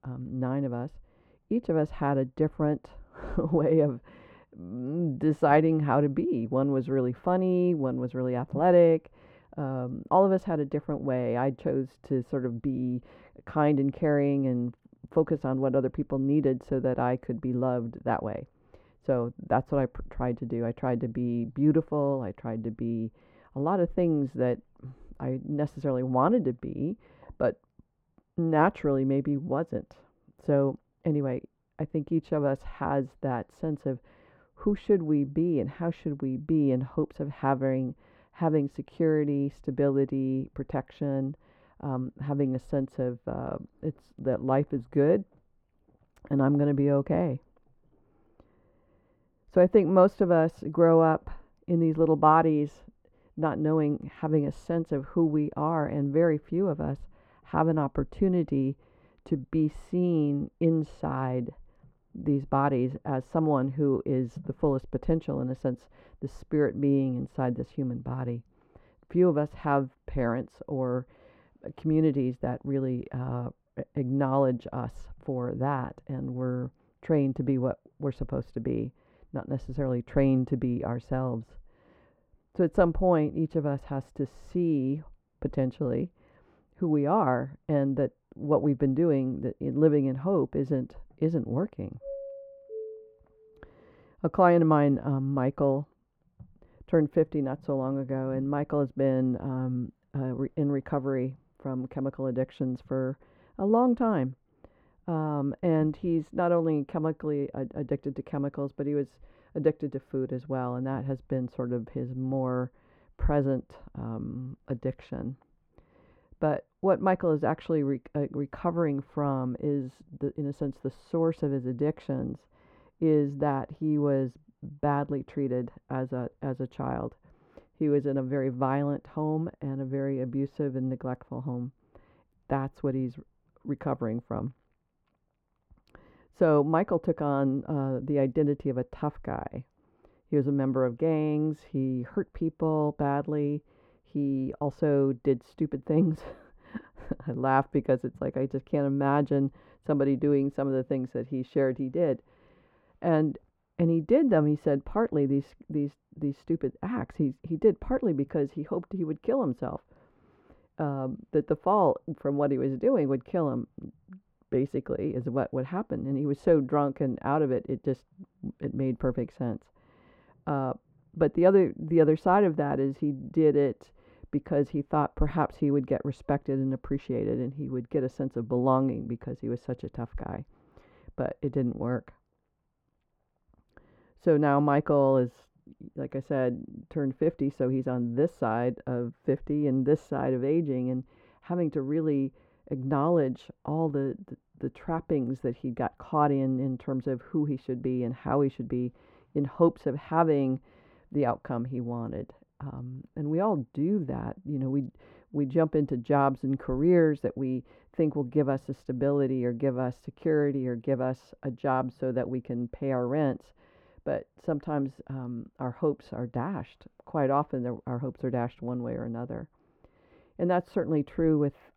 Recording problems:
muffled; very; fading above 2.5 kHz
doorbell; faint; from 1:32 to 1:33; peak 10 dB below the speech

